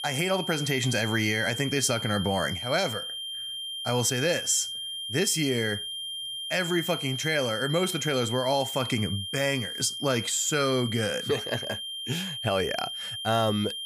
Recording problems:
high-pitched whine; loud; throughout; 3 kHz, 5 dB below the speech

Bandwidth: 15 kHz